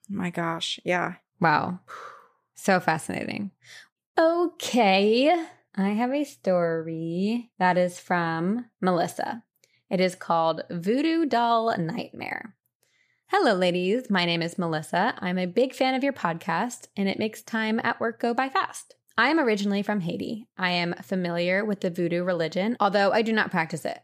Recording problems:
none

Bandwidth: 14.5 kHz